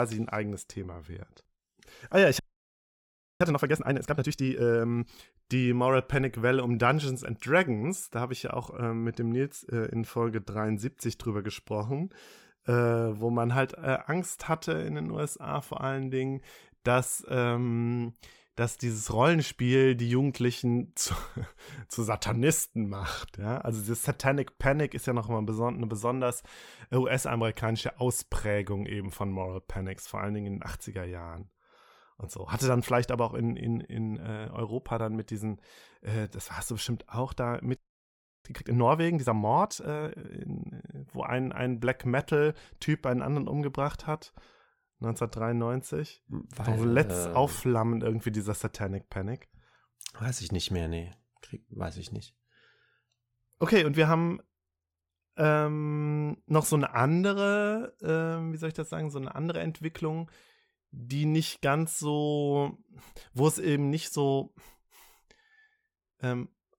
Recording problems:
abrupt cut into speech; at the start
audio freezing; at 2.5 s for 1 s and at 38 s for 0.5 s

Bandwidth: 17 kHz